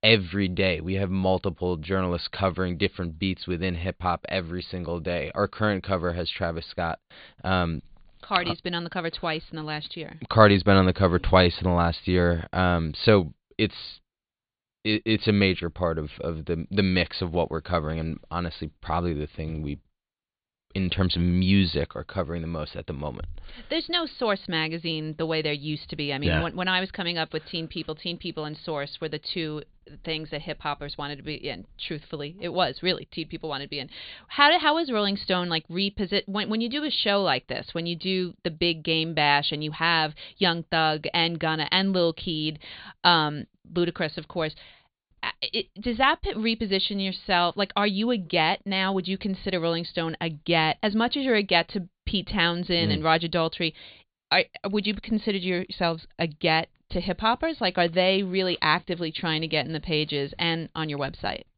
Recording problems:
high frequencies cut off; severe; nothing above 4.5 kHz

